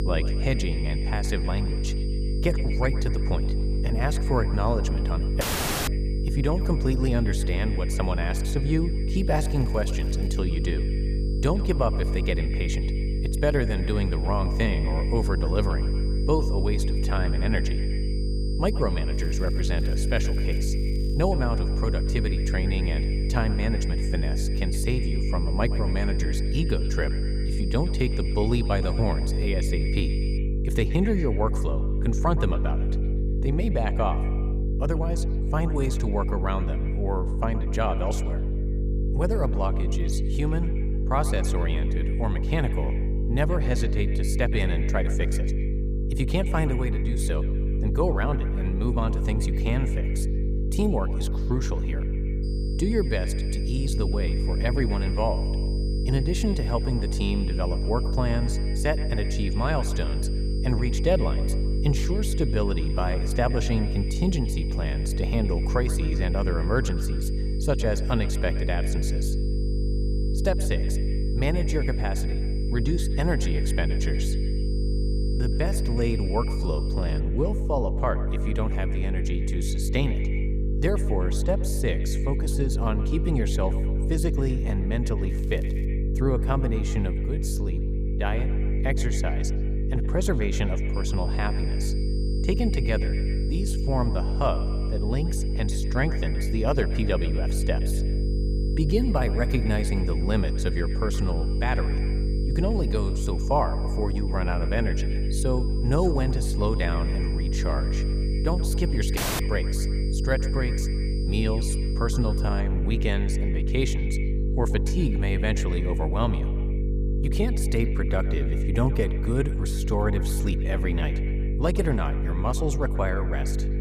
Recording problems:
echo of what is said; noticeable; throughout; 120 ms later, 15 dB below the speech
electrical hum; loud; throughout; 50 Hz, 7 dB below the speech
high-pitched whine; noticeable; until 30 s, from 52 s to 1:17 and from 1:31 to 1:53; 5 kHz, 15 dB below the speech
crackling; faint; 4 times, first at 9.5 s; 25 dB below the speech
audio cutting out; at 5.5 s and at 1:49

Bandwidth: 15 kHz